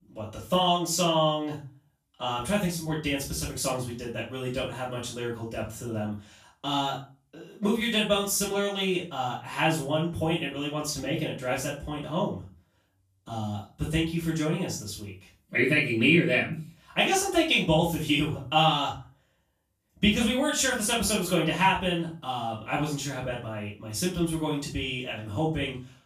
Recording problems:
off-mic speech; far
room echo; noticeable; dies away in 0.3 s

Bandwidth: 14.5 kHz